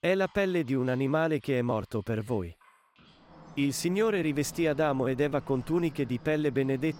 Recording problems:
animal sounds; faint; throughout; 25 dB below the speech

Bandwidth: 16 kHz